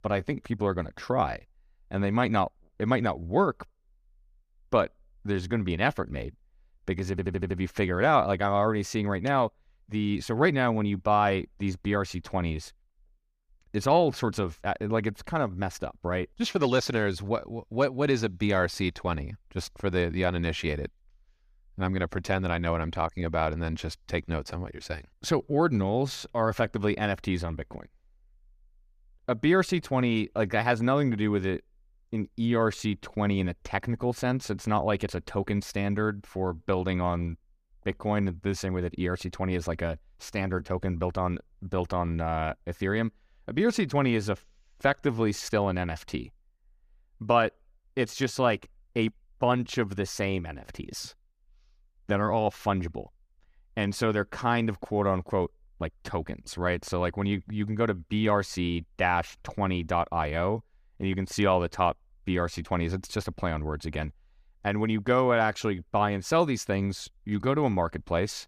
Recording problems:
audio stuttering; at 7 s

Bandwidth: 15 kHz